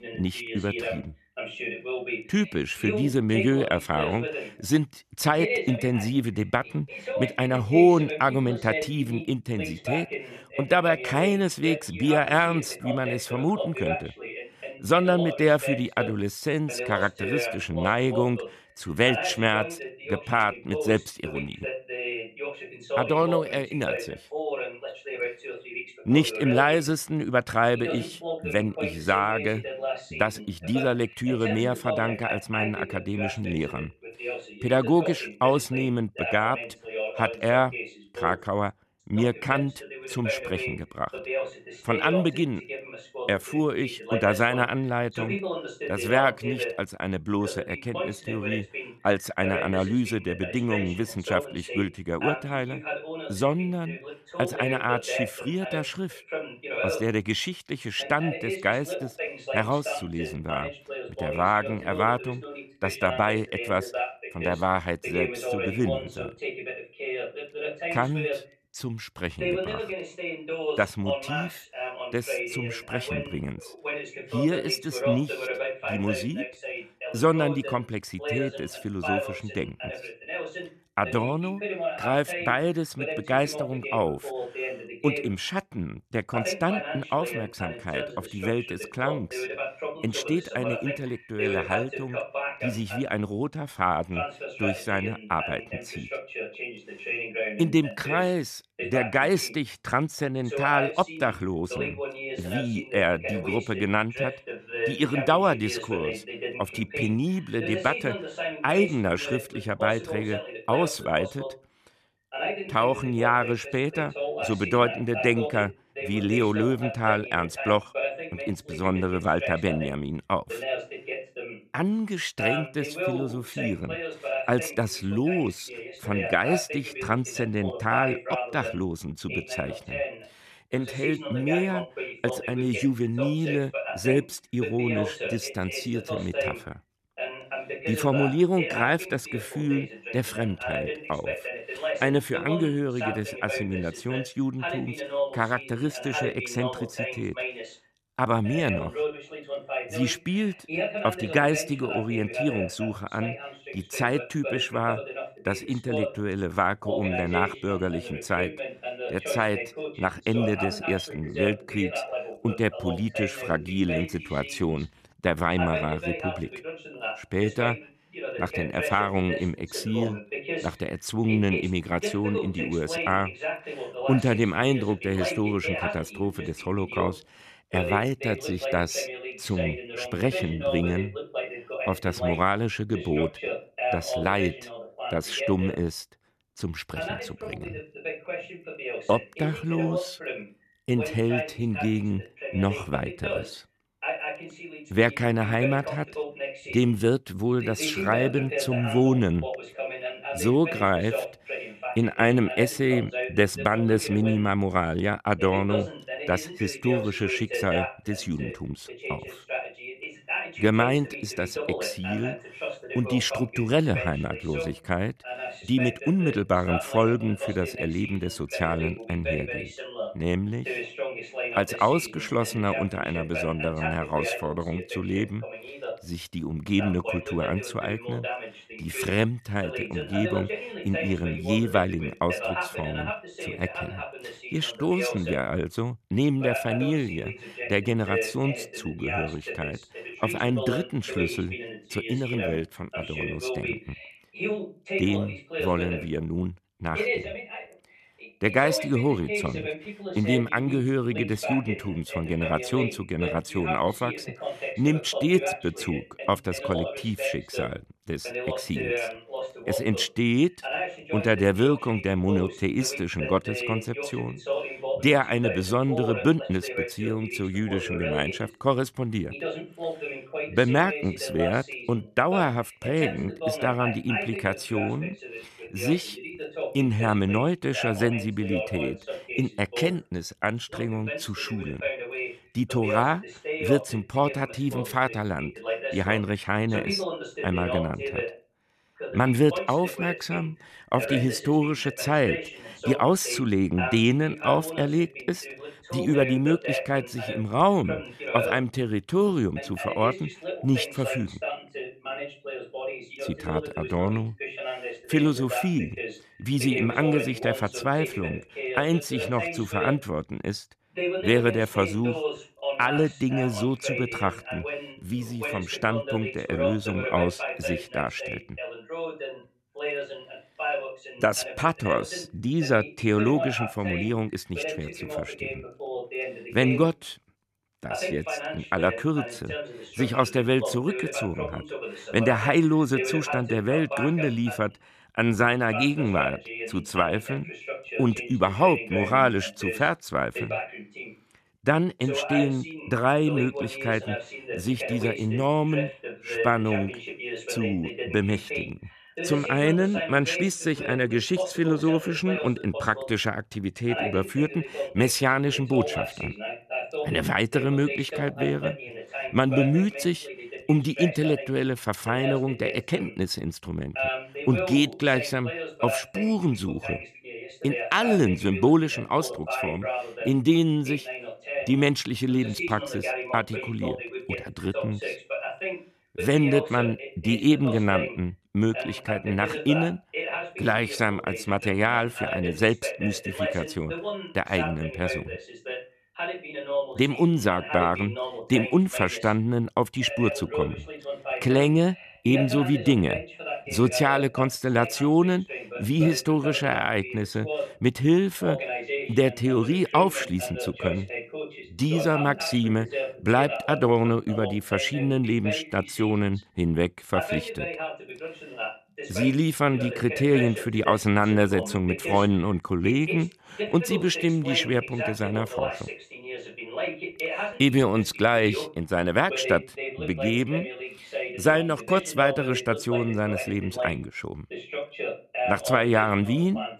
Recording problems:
voice in the background; loud; throughout; 7 dB below the speech

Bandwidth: 14.5 kHz